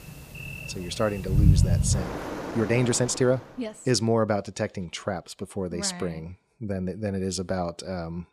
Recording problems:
rain or running water; very loud; until 3.5 s; 1 dB above the speech
uneven, jittery; slightly; from 2.5 to 7 s

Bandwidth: 15 kHz